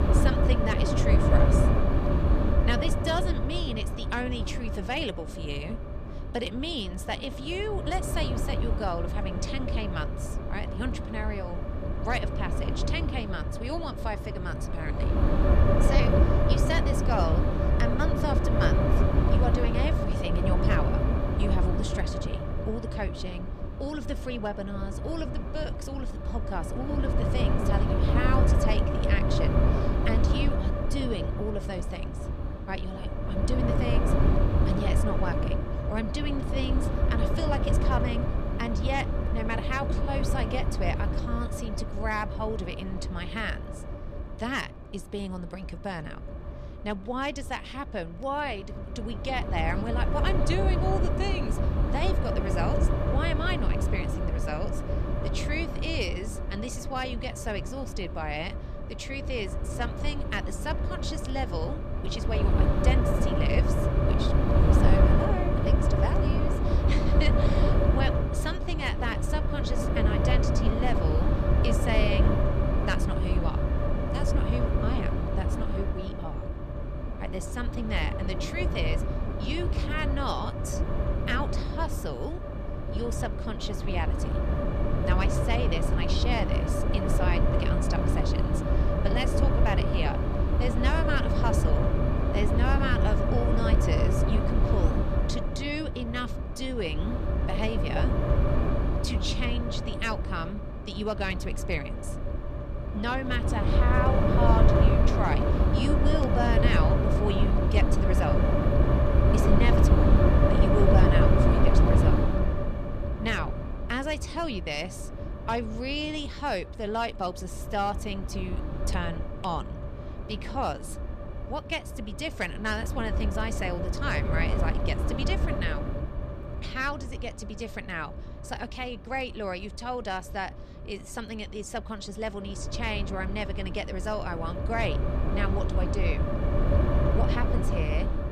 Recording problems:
wind noise on the microphone; heavy; as loud as the speech

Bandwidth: 14 kHz